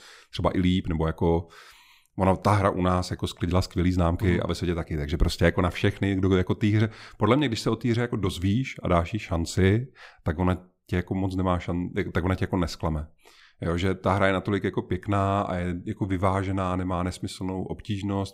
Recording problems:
none

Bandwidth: 15.5 kHz